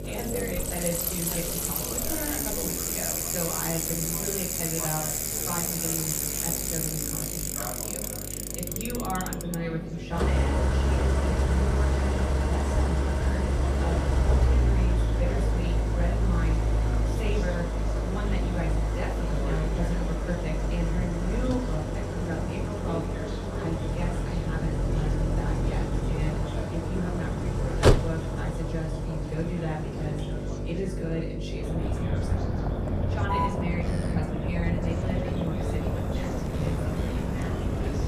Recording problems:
off-mic speech; far
echo of what is said; faint; throughout; 450 ms later, 20 dB below the speech
room echo; slight; dies away in 0.6 s
traffic noise; very loud; throughout; 6 dB above the speech
electrical hum; loud; throughout; 50 Hz, 6 dB below the speech
background chatter; loud; throughout; 4 voices, 8 dB below the speech

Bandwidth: 14.5 kHz